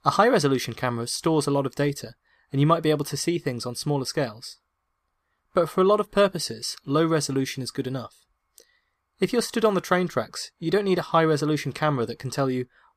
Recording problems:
none

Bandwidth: 14.5 kHz